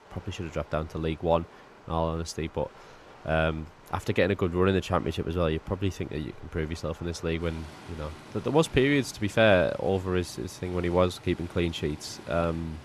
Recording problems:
rain or running water; faint; throughout; 20 dB below the speech

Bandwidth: 13.5 kHz